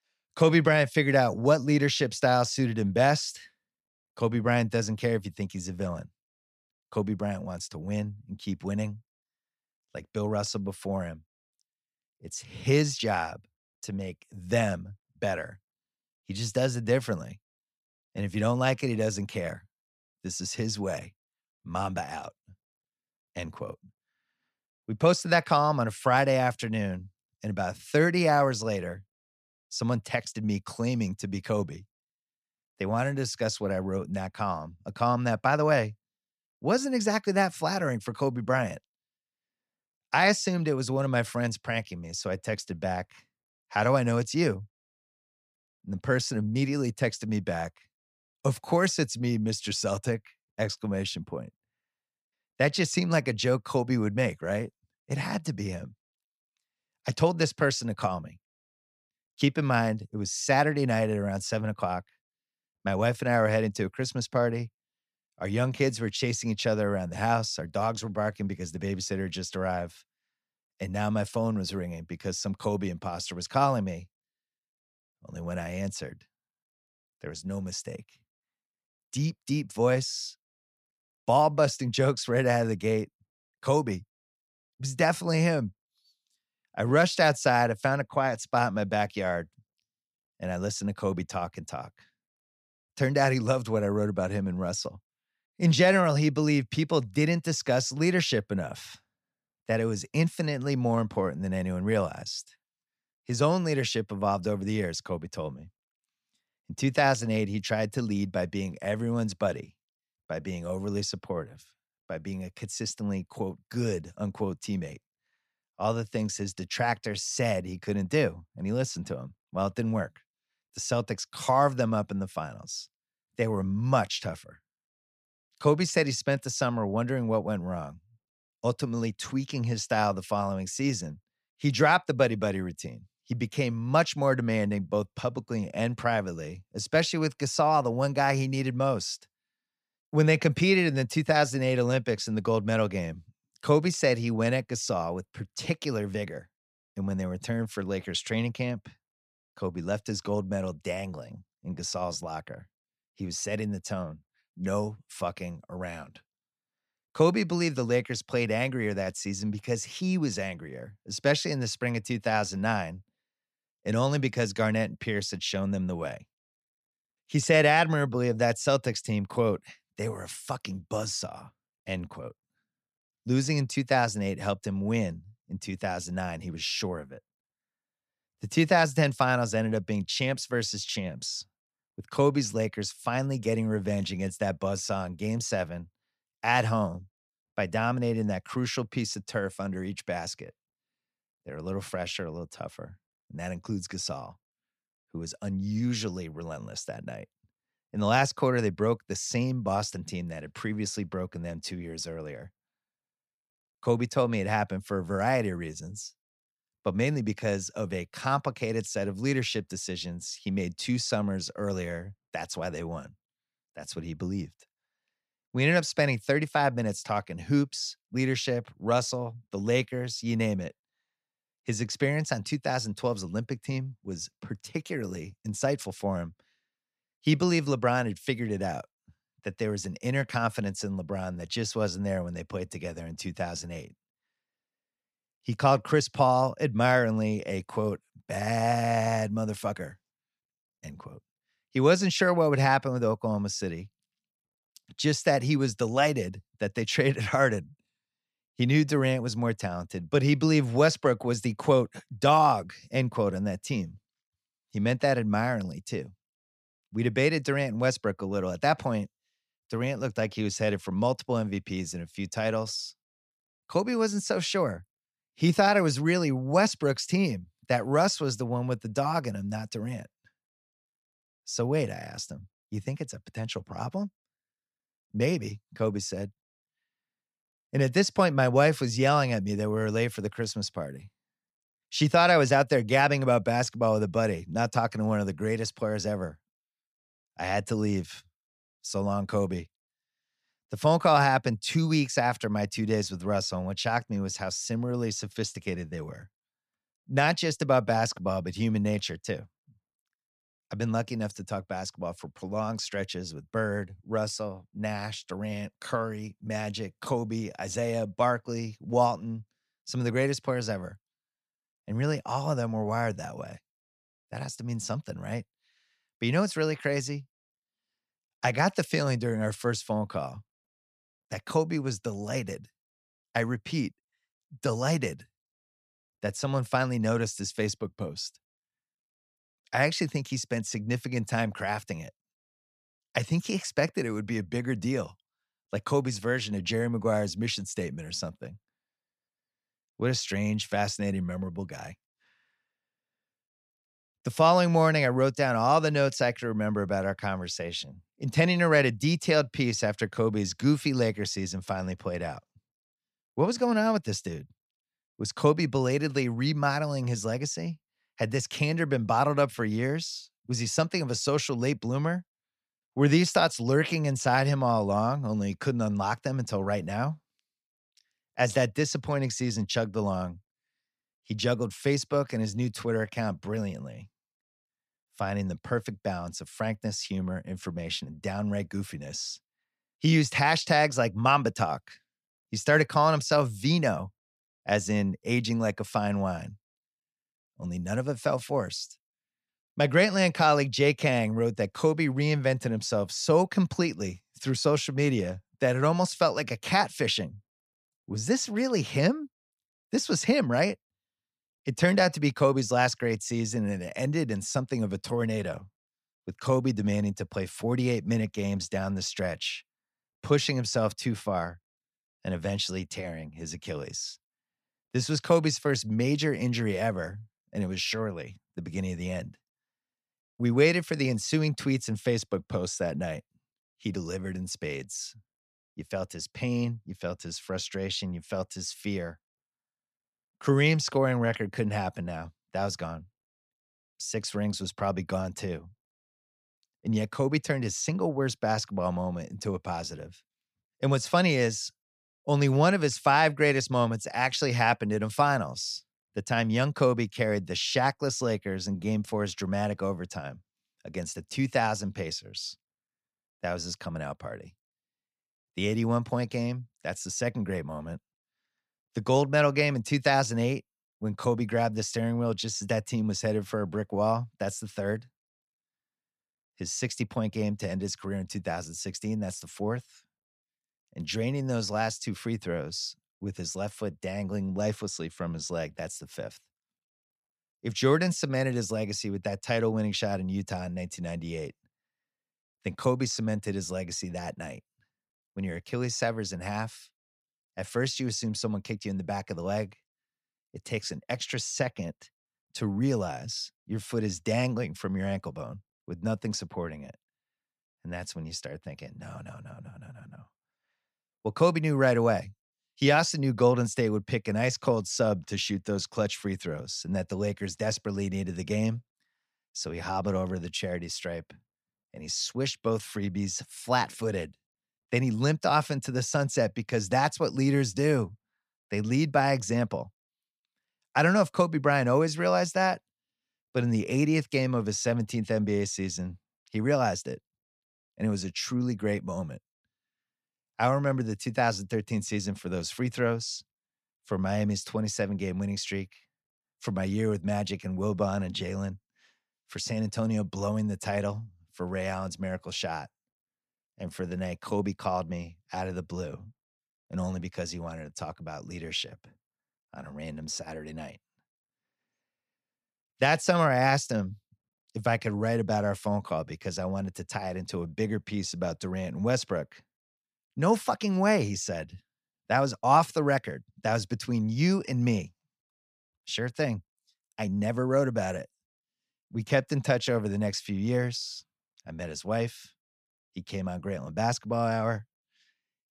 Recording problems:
none

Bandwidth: 14.5 kHz